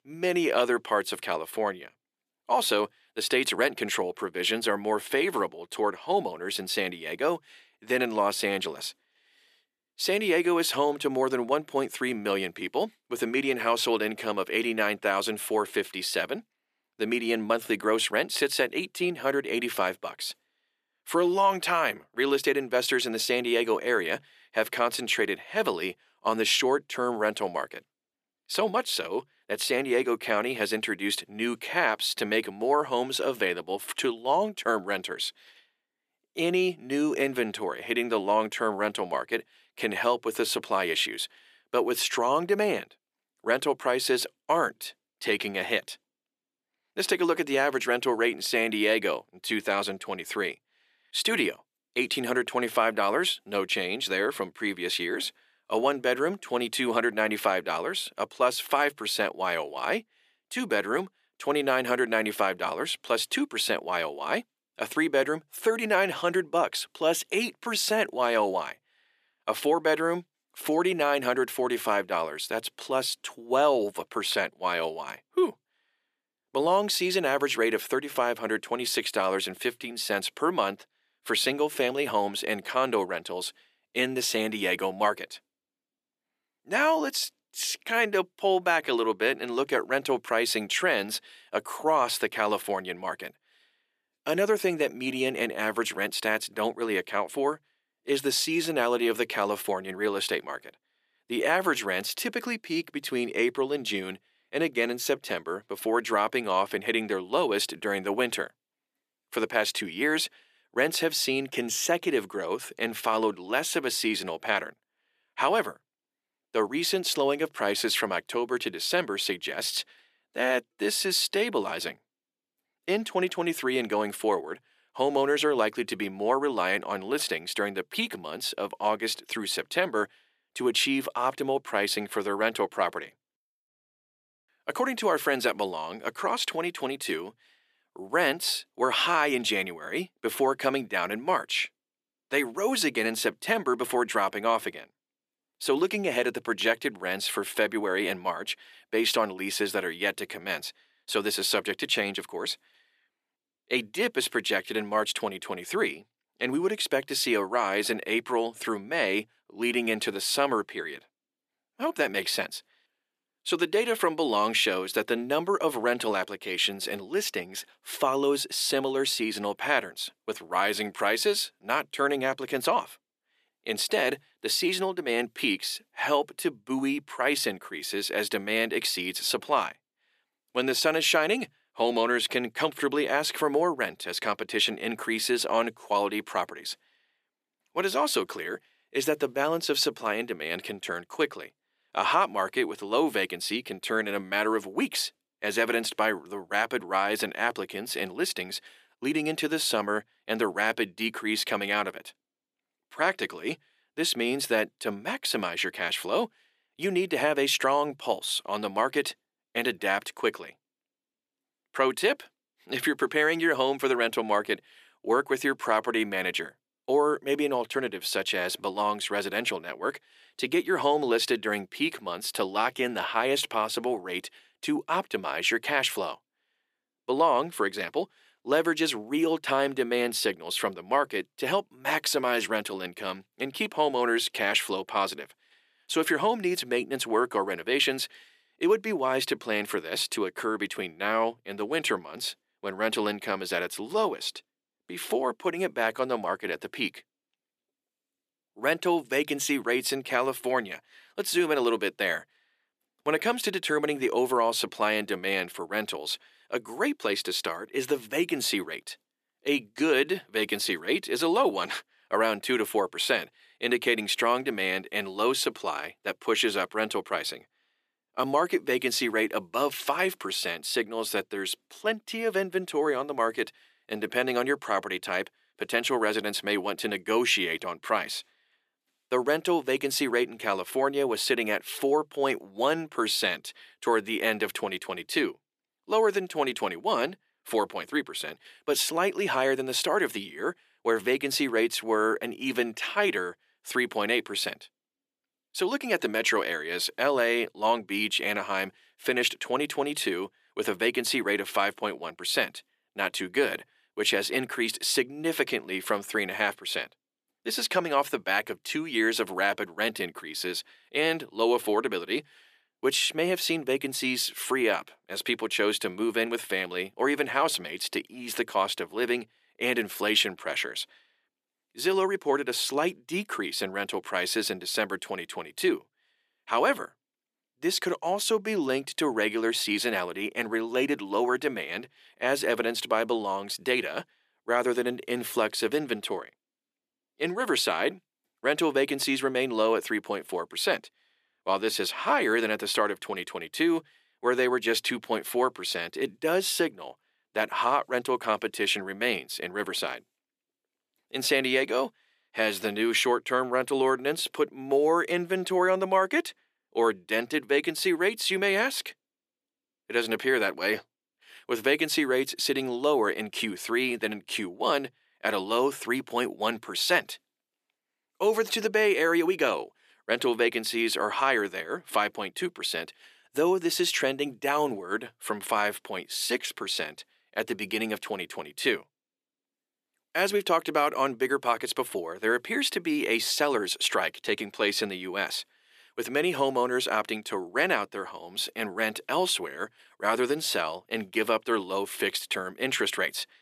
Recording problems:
thin; somewhat; fading below 400 Hz

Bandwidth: 14.5 kHz